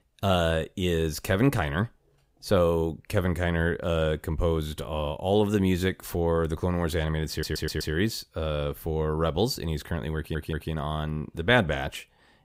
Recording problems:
audio stuttering; at 7.5 s and at 10 s

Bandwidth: 15.5 kHz